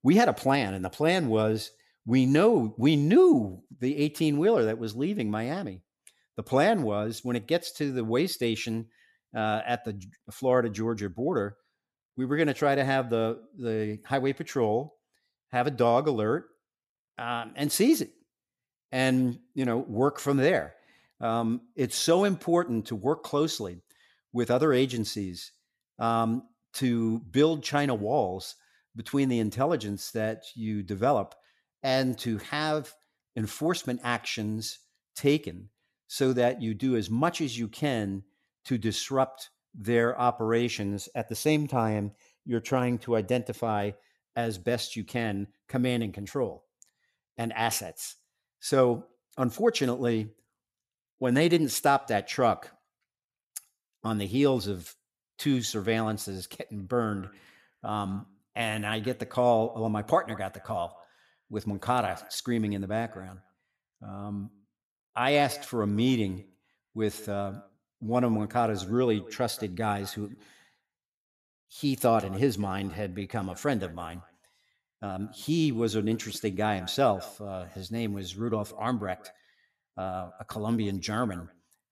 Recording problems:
echo of what is said; faint; from 57 s on; 180 ms later, 25 dB below the speech

